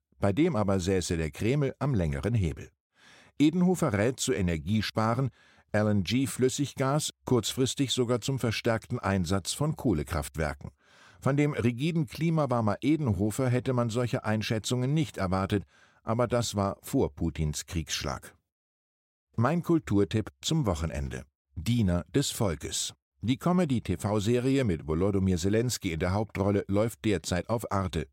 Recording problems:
none

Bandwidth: 16 kHz